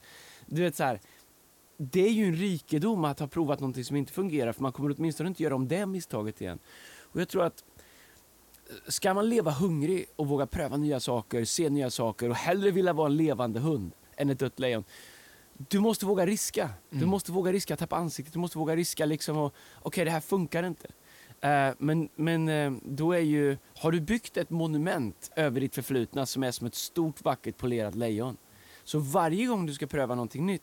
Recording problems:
hiss; faint; throughout; 30 dB below the speech

